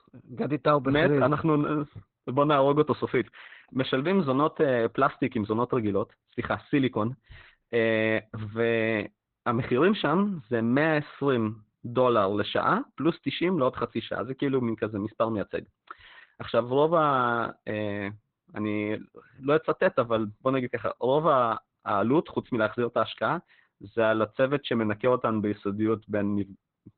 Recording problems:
garbled, watery; badly; nothing above 4 kHz

